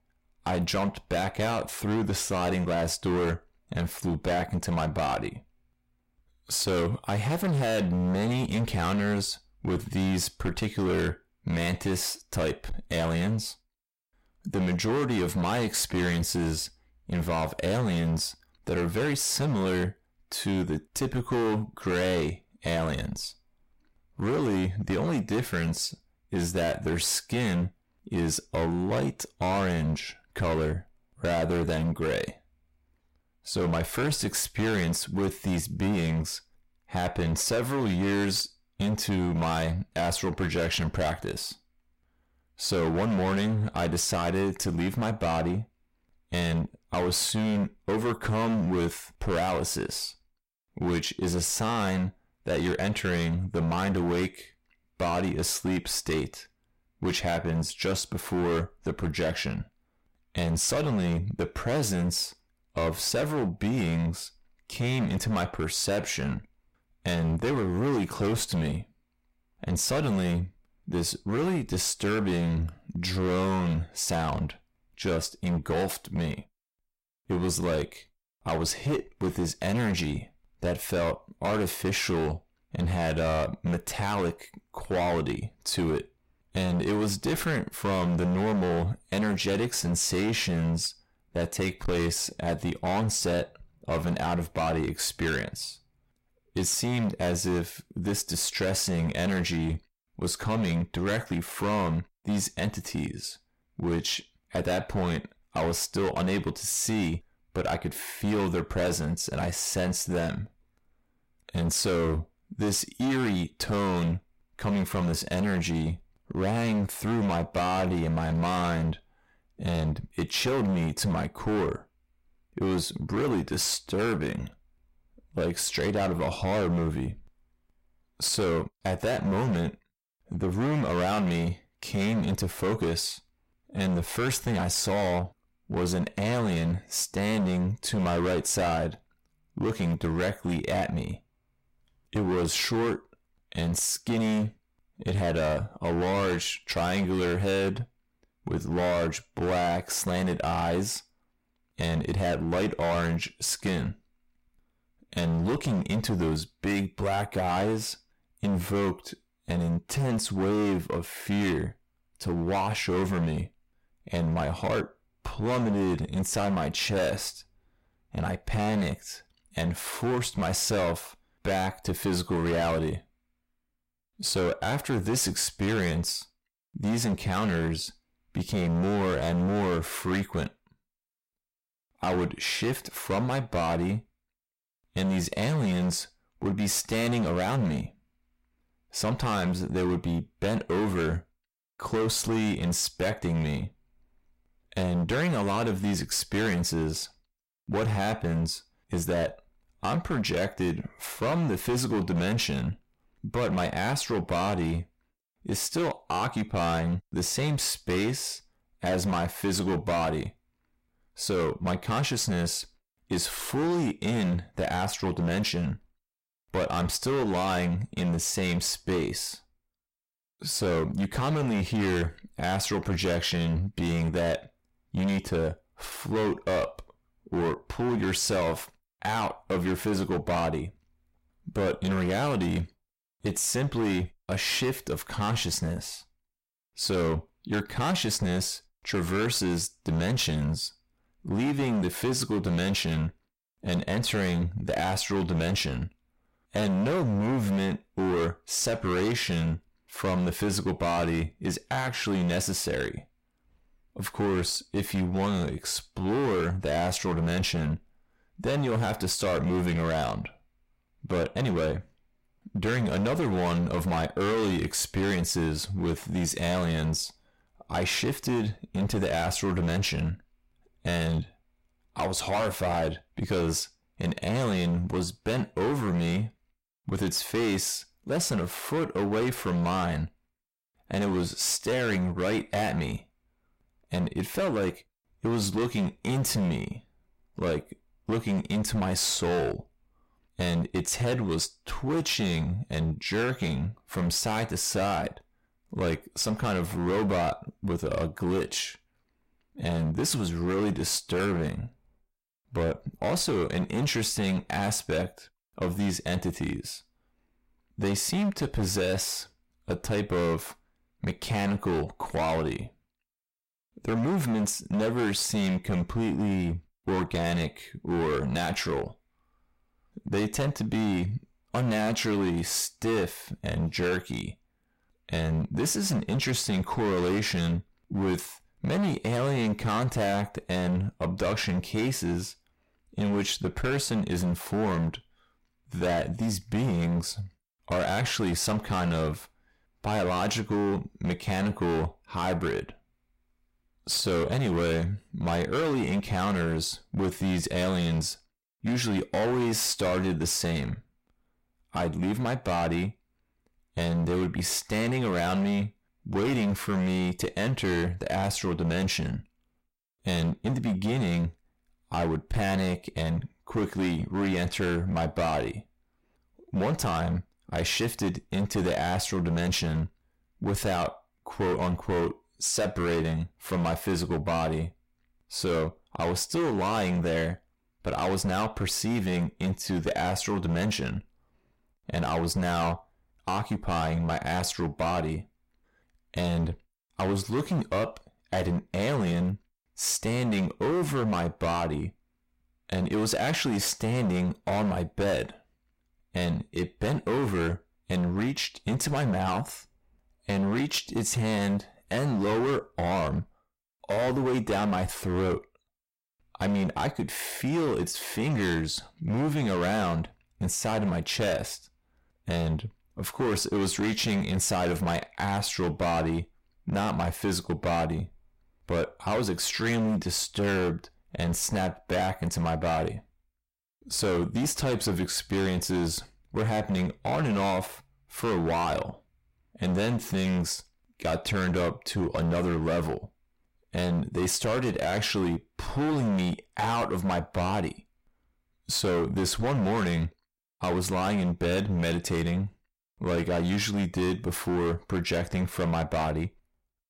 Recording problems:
distortion; heavy; 18% of the sound clipped

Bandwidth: 16 kHz